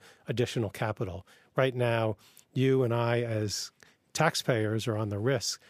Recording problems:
none

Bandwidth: 15 kHz